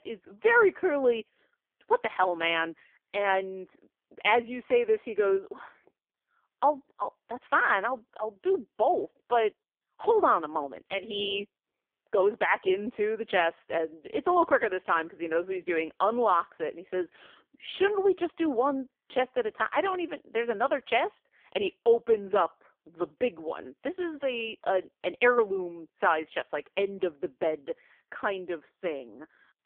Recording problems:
phone-call audio; poor line; nothing above 3.5 kHz

